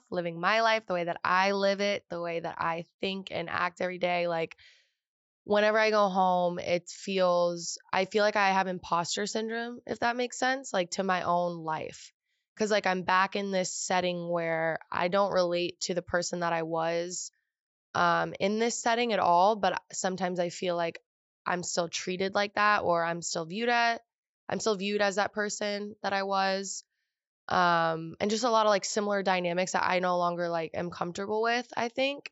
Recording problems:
high frequencies cut off; noticeable; nothing above 8 kHz

